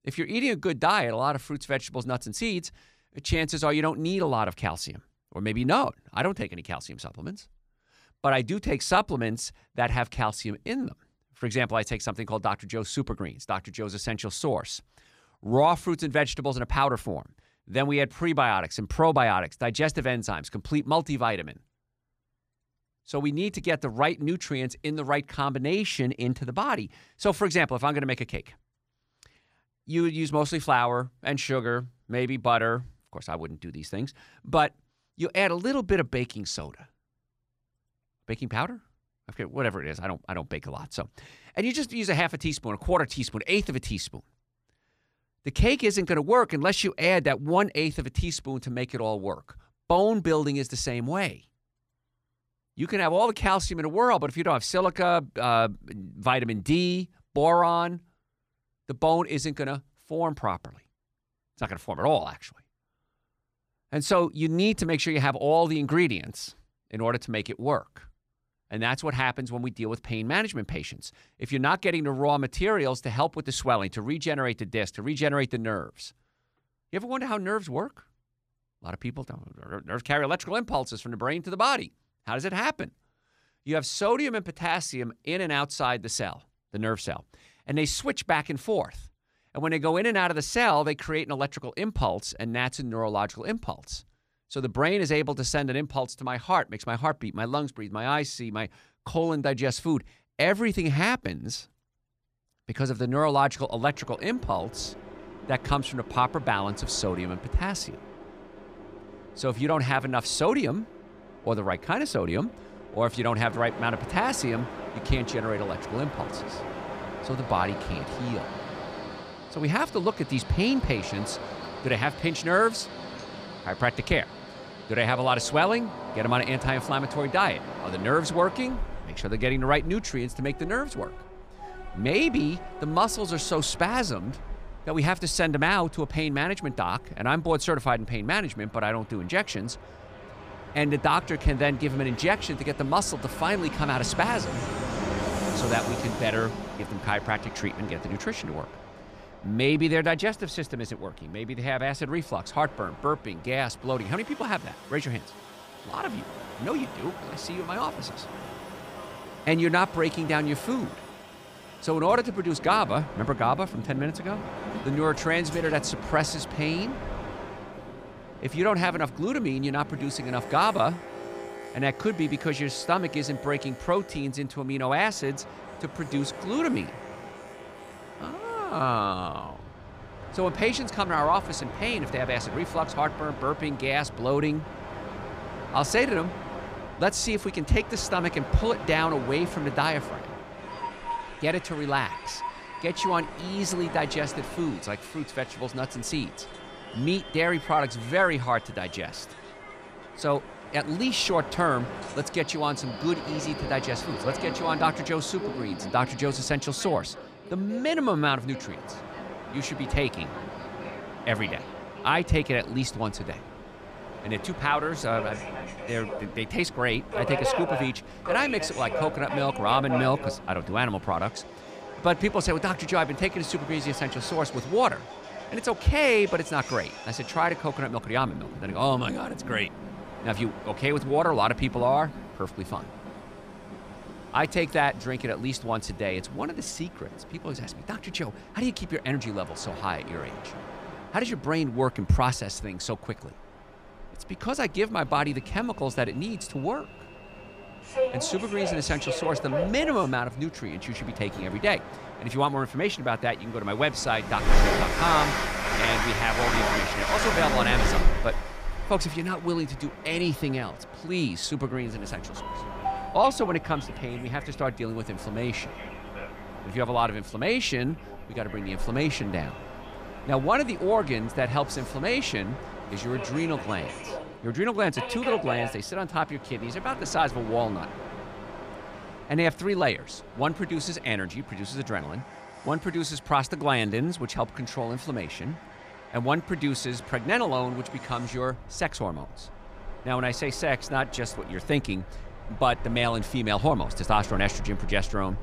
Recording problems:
train or aircraft noise; loud; from 1:44 on; 9 dB below the speech

